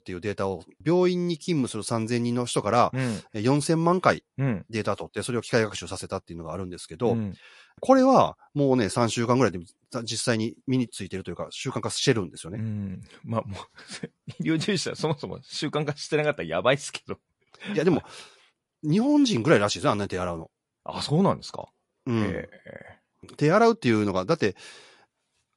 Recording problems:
garbled, watery; slightly; nothing above 11 kHz

